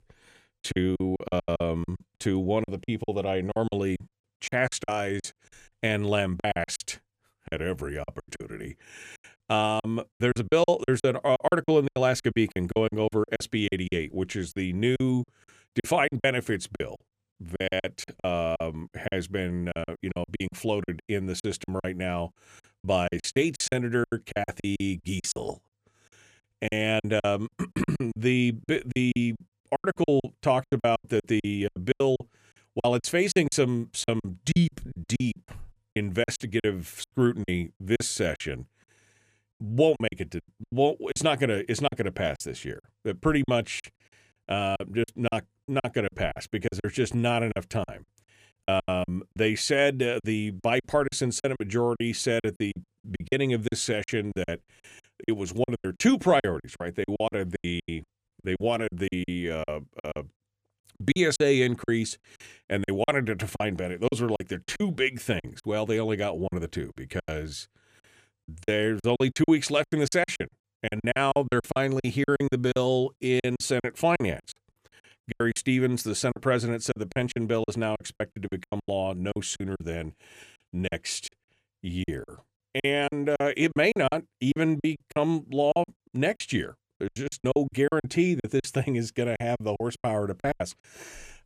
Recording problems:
choppy; very; 17% of the speech affected

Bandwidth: 14.5 kHz